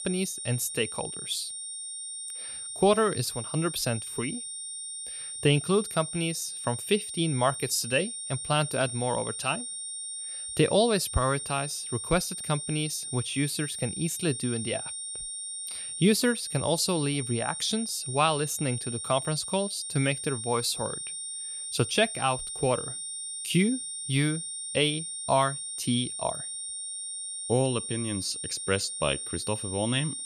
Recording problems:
high-pitched whine; loud; throughout; 9 kHz, 5 dB below the speech

